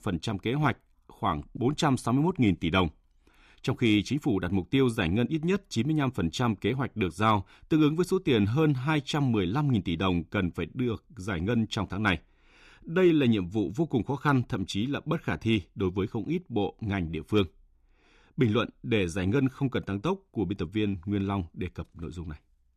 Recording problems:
none

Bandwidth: 14.5 kHz